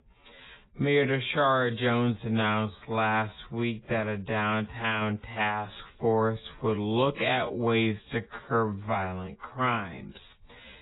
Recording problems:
garbled, watery; badly; nothing above 4 kHz
wrong speed, natural pitch; too slow; 0.6 times normal speed

